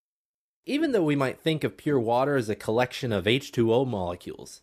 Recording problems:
none

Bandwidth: 14.5 kHz